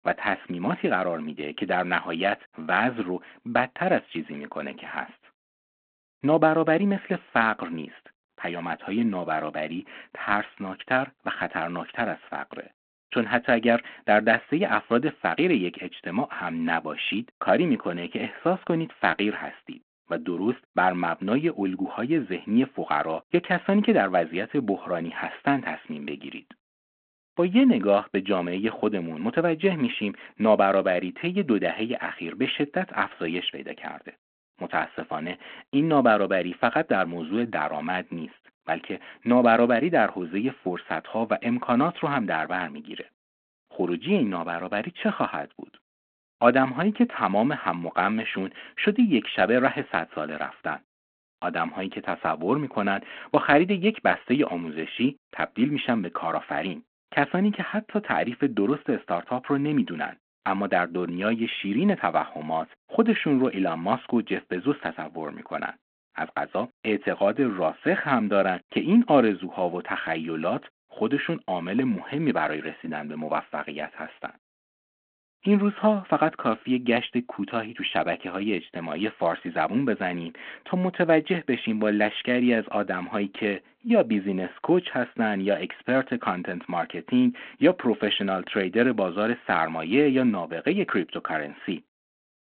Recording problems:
phone-call audio

